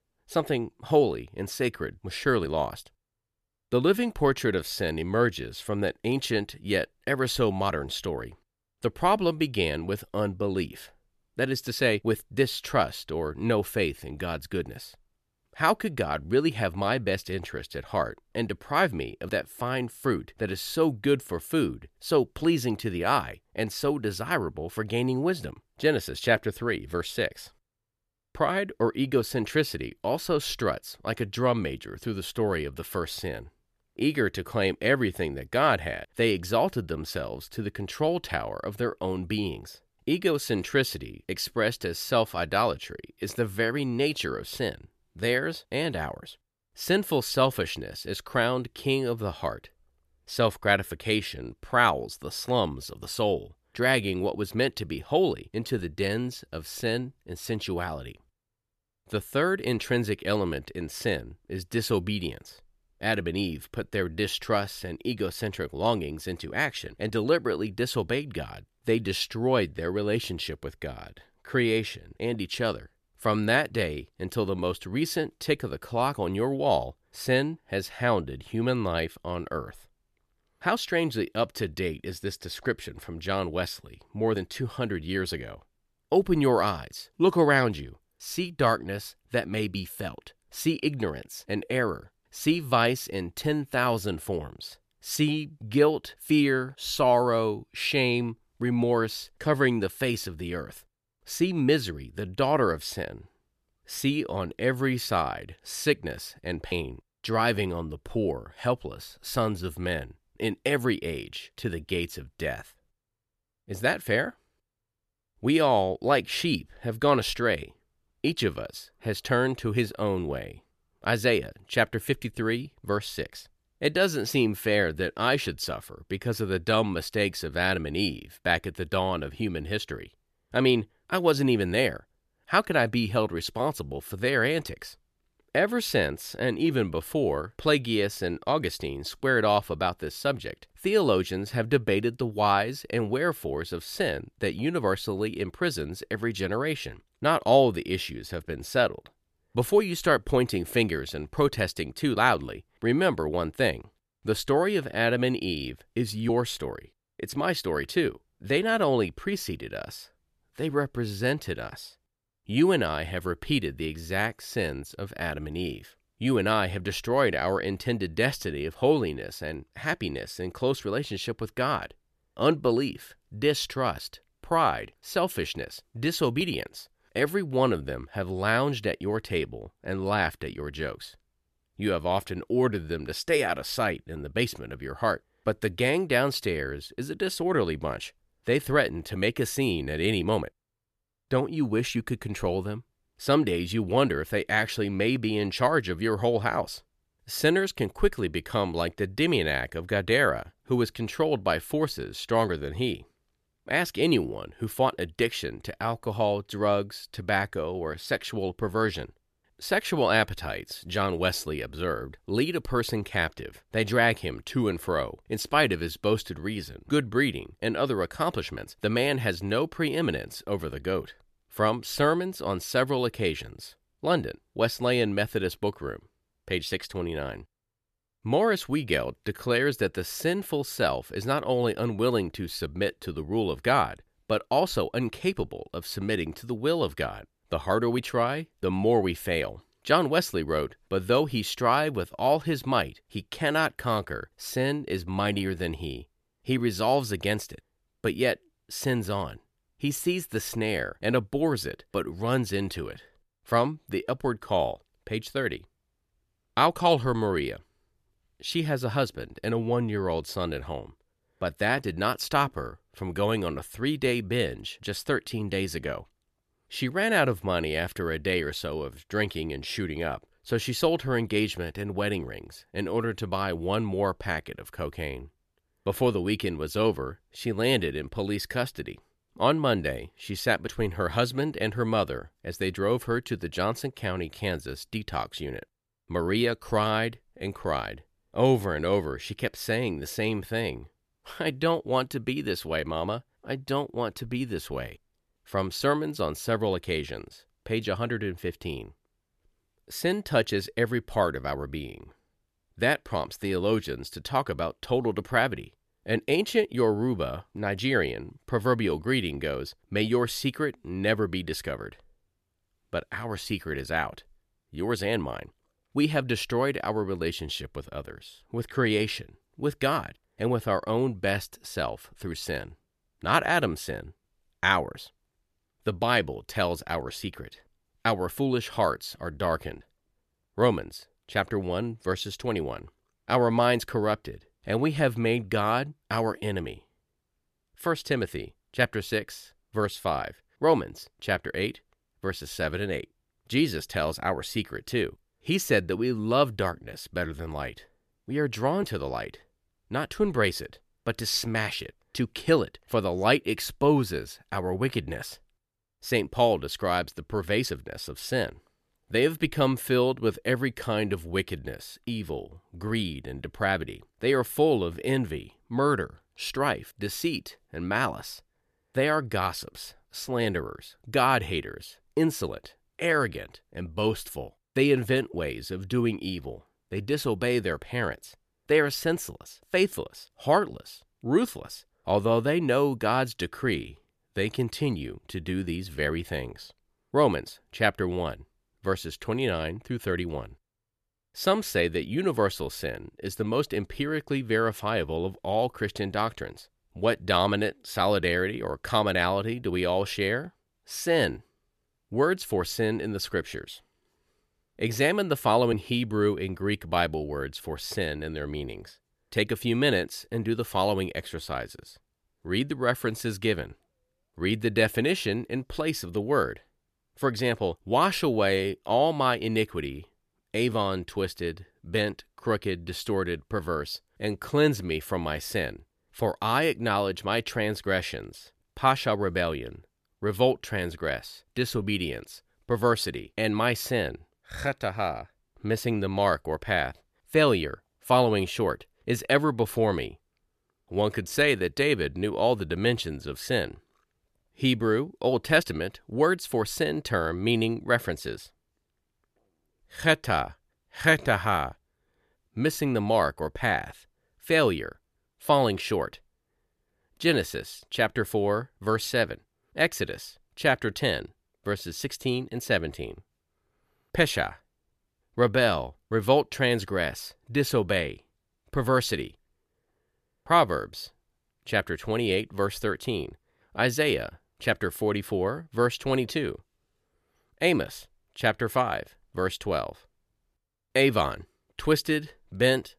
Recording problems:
none

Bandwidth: 14 kHz